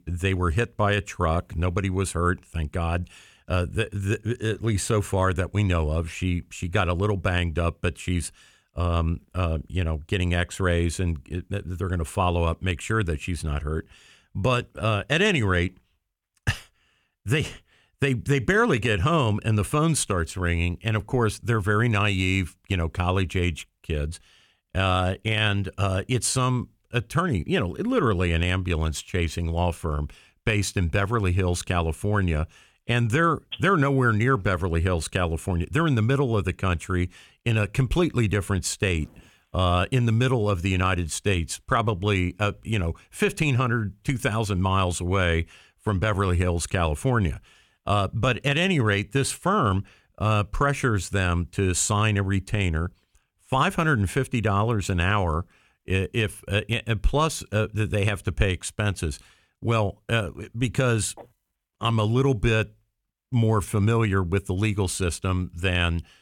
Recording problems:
none

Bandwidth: 18 kHz